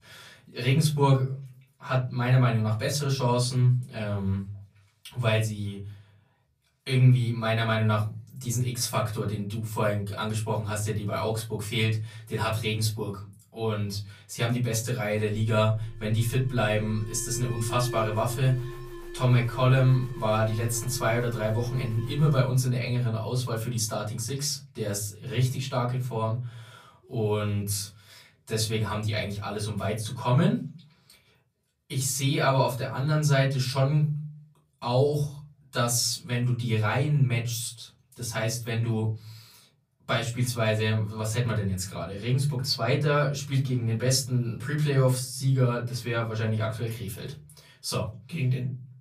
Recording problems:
off-mic speech; far
room echo; slight; dies away in 0.5 s
alarm; noticeable; from 15 to 23 s; peak 9 dB below the speech

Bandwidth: 15 kHz